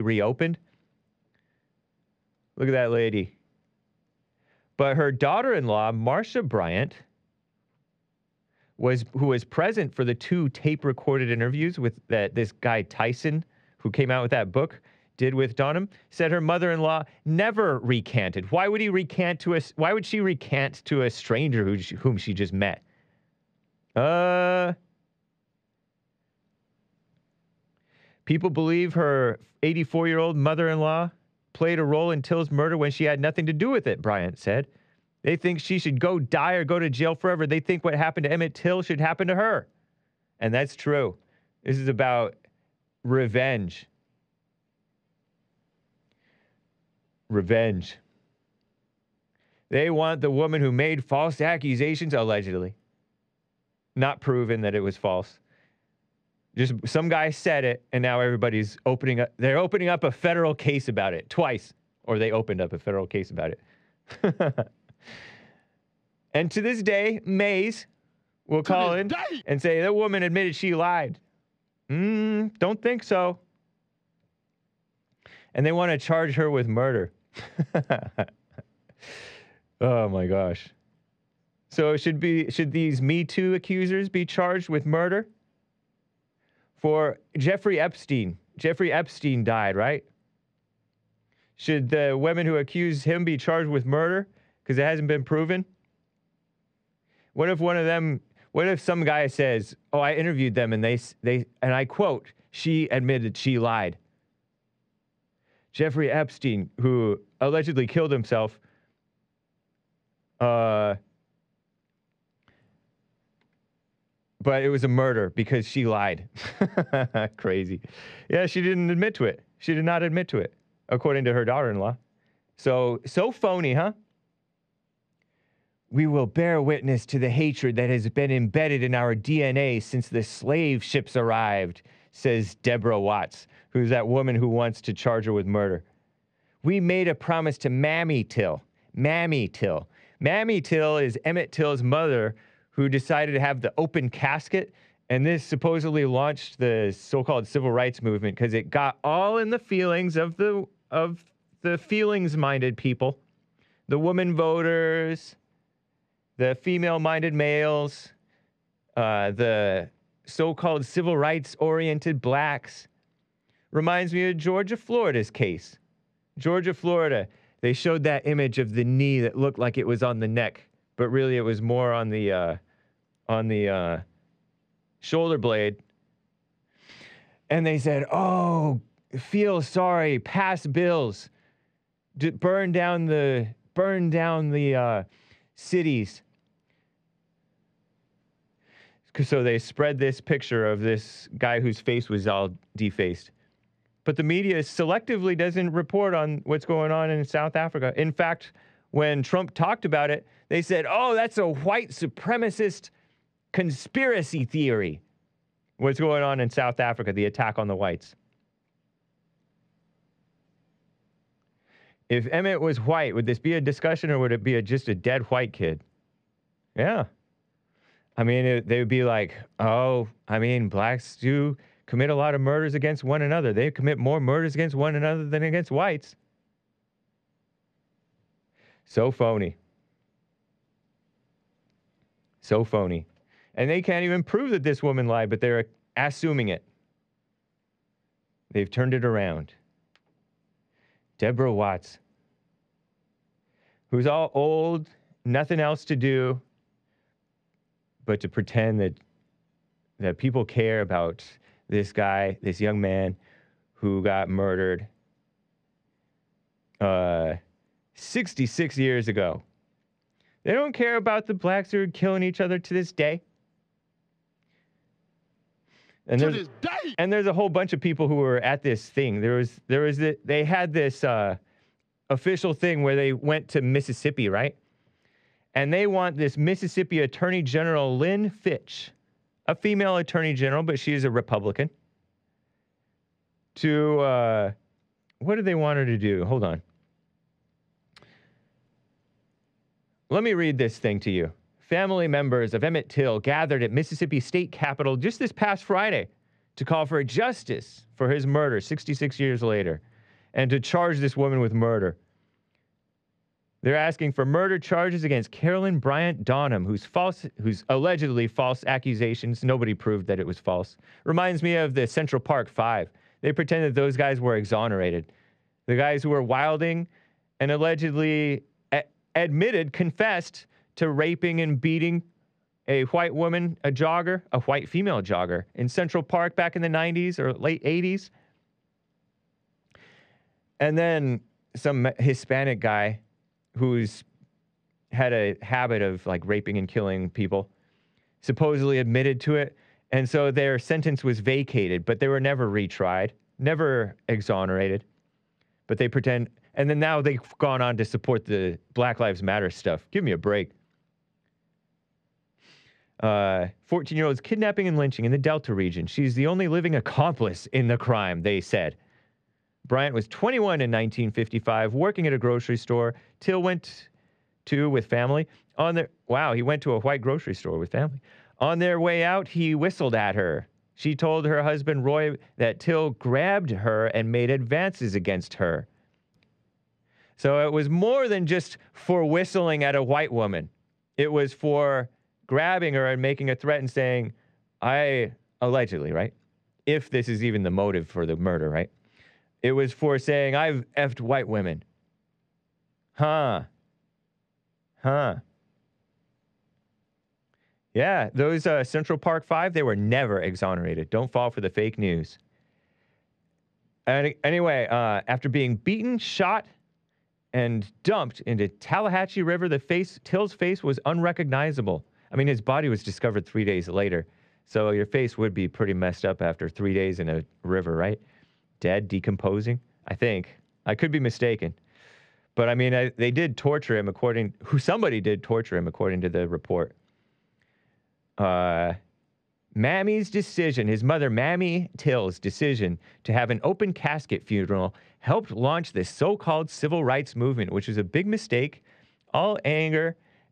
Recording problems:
muffled; slightly; fading above 3.5 kHz
abrupt cut into speech; at the start

